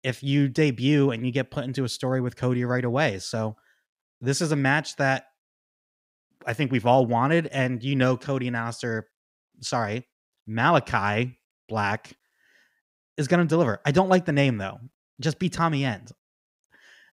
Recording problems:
none

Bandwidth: 15.5 kHz